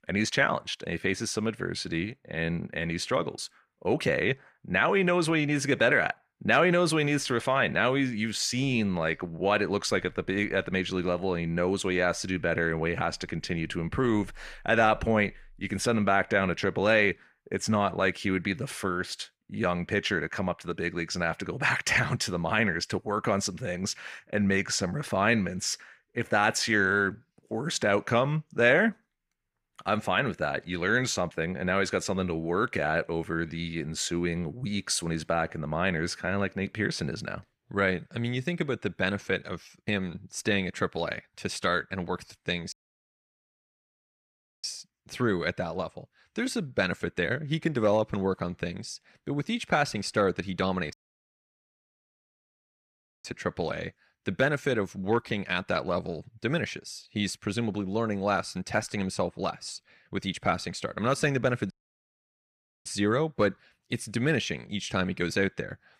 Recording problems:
audio cutting out; at 43 s for 2 s, at 51 s for 2.5 s and at 1:02 for 1 s

